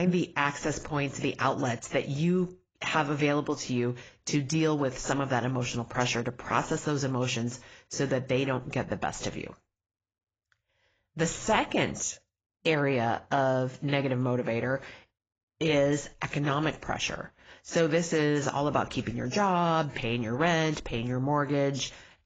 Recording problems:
garbled, watery; badly; nothing above 7.5 kHz
abrupt cut into speech; at the start

